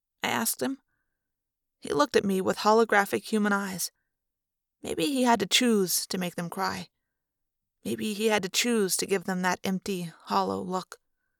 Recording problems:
none

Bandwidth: 18.5 kHz